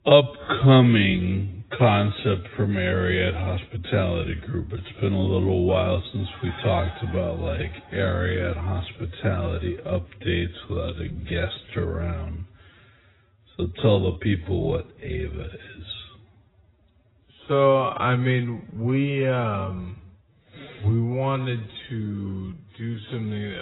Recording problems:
garbled, watery; badly; nothing above 4 kHz
wrong speed, natural pitch; too slow; 0.5 times normal speed
abrupt cut into speech; at the end

